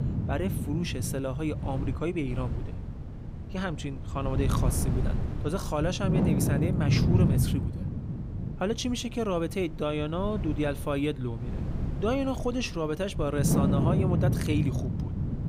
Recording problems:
wind noise on the microphone; heavy; 6 dB below the speech

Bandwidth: 15.5 kHz